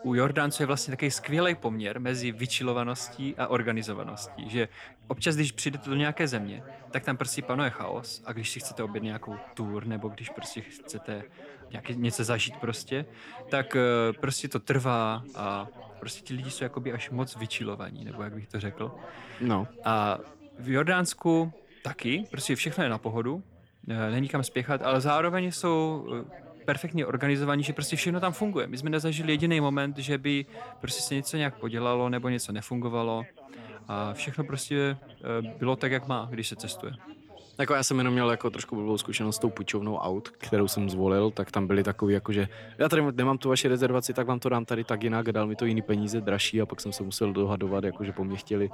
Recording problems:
background chatter; noticeable; throughout; 3 voices, 20 dB below the speech

